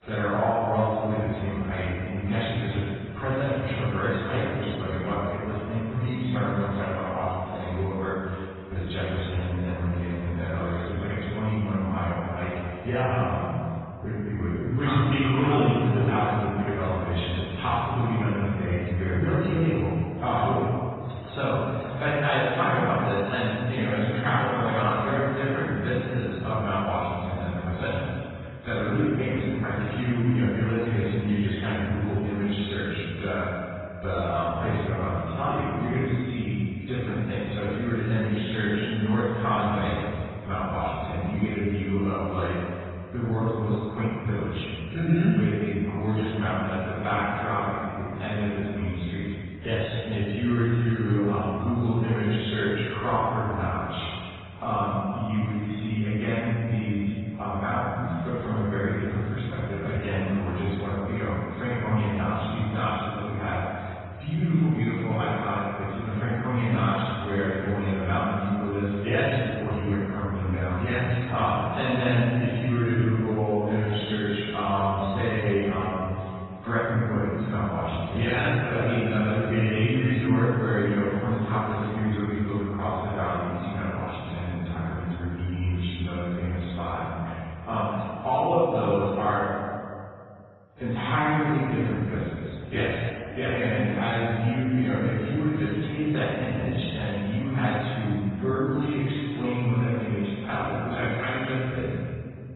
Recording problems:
room echo; strong; dies away in 2.1 s
off-mic speech; far
garbled, watery; badly; nothing above 4 kHz

